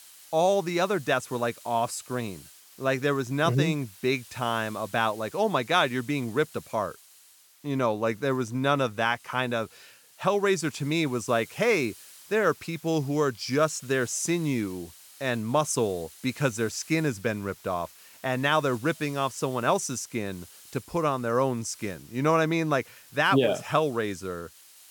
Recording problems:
hiss; faint; throughout; 20 dB below the speech

